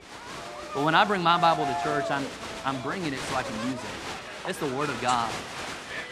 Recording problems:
crowd noise; loud; throughout; 7 dB below the speech

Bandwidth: 15 kHz